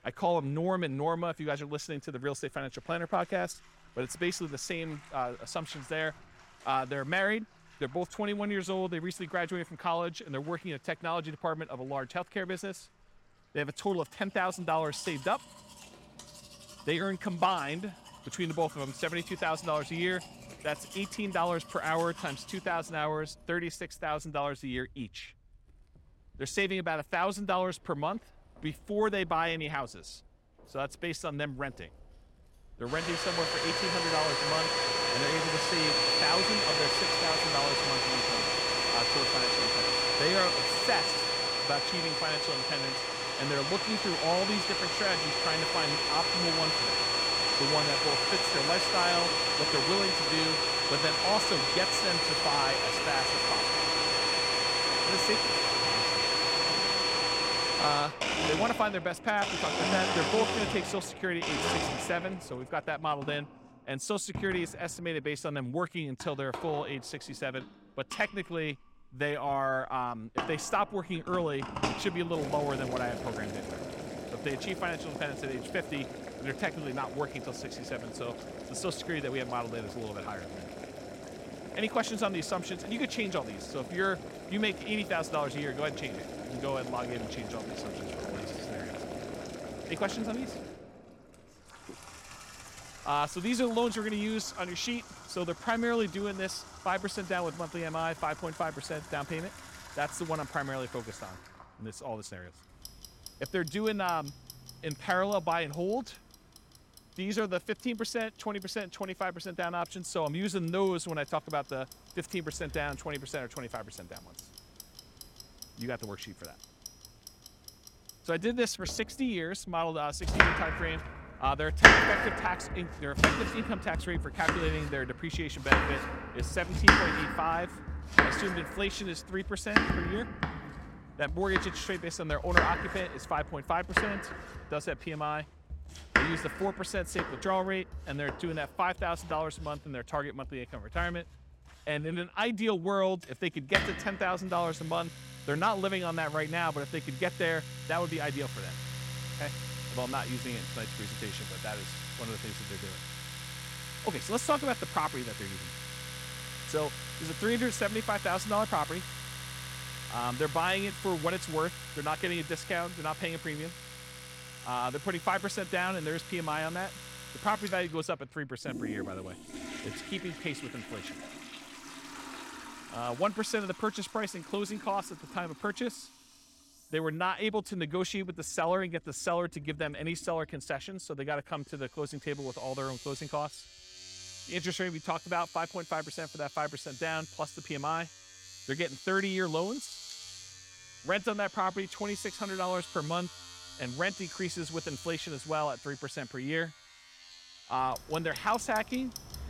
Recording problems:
household noises; very loud; throughout; 3 dB above the speech

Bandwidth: 16.5 kHz